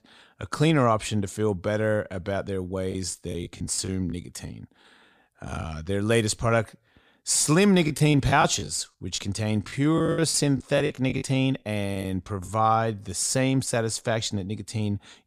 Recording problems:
choppy; very; from 3 to 5.5 s and from 8 to 12 s; 12% of the speech affected

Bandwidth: 15 kHz